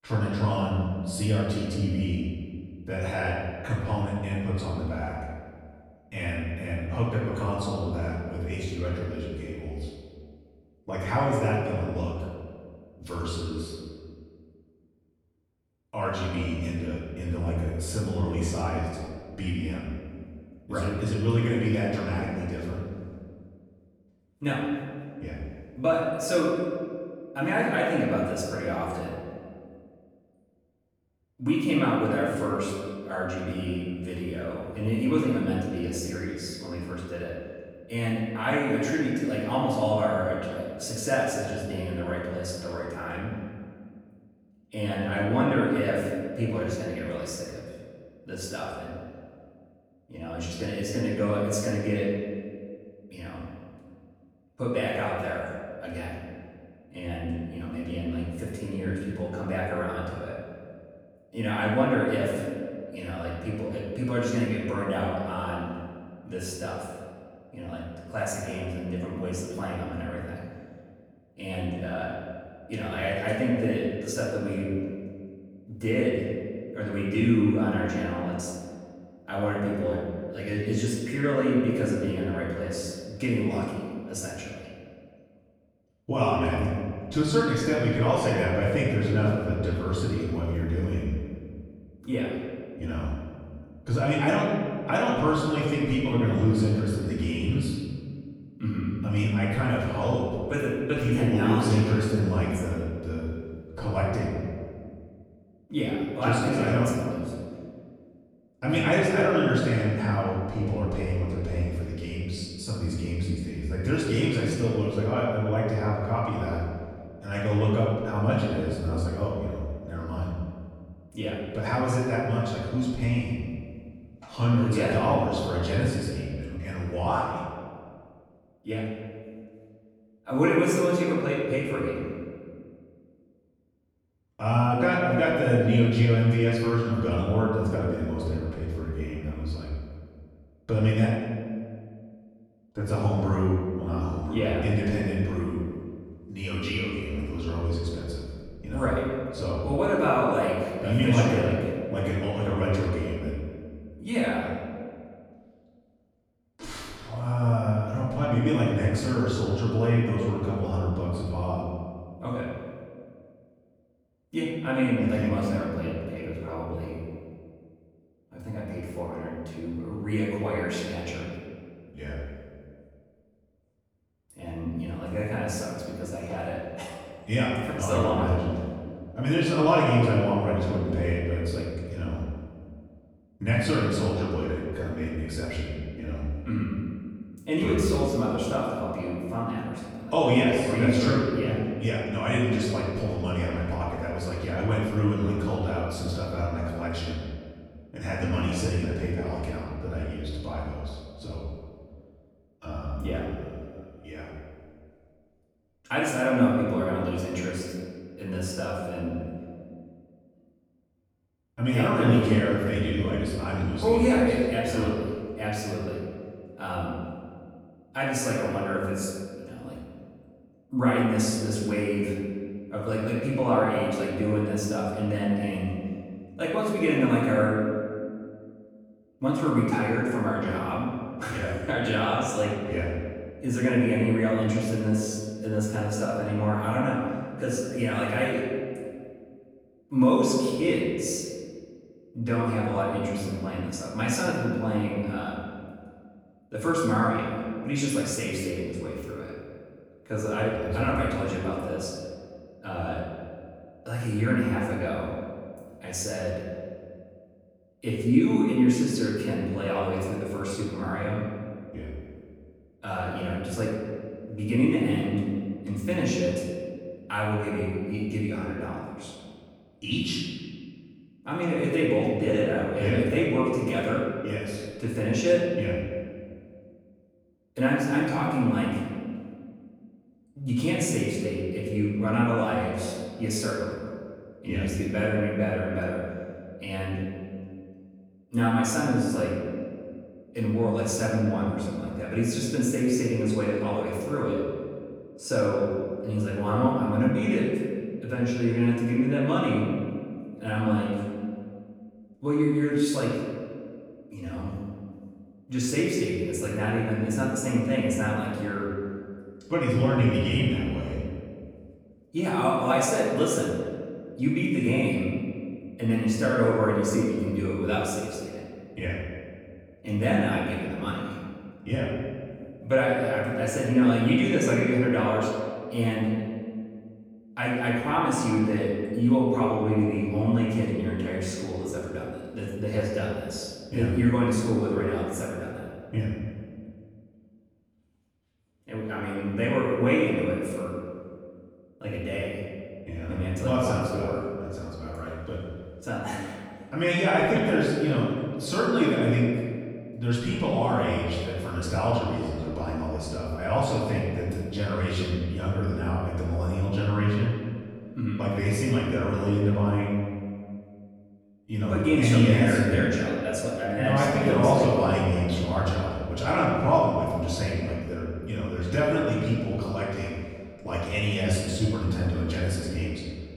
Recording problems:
off-mic speech; far
room echo; noticeable; dies away in 1.9 s

